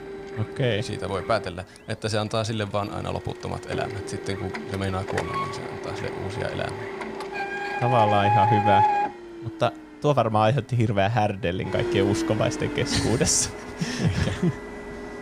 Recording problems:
household noises; loud; throughout; 3 dB below the speech

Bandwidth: 15.5 kHz